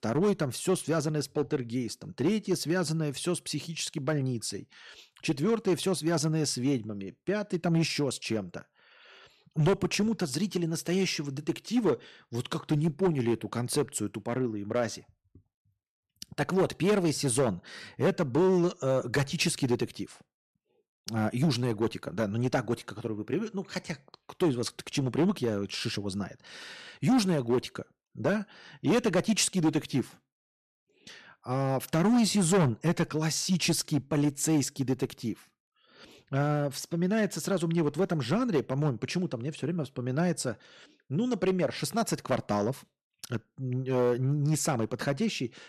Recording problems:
distortion; slight; 4% of the sound clipped

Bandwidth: 13.5 kHz